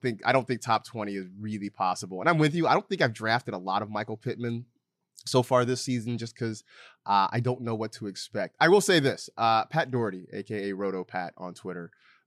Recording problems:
none

